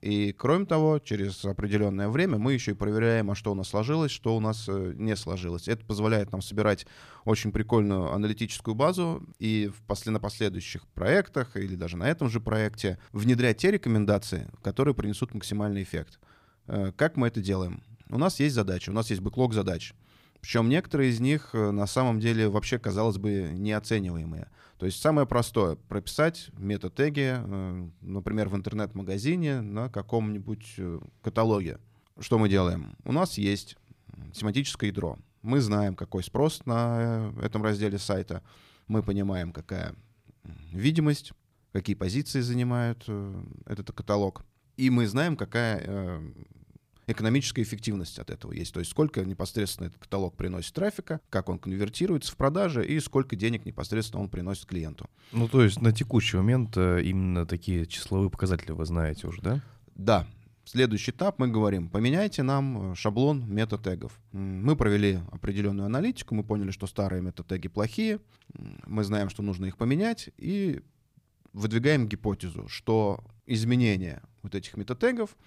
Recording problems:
none

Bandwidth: 15 kHz